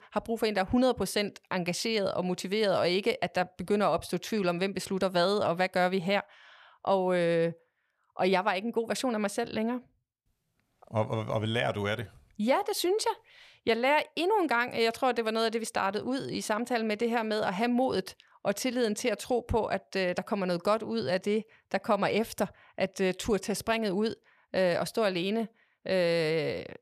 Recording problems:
none

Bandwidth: 14.5 kHz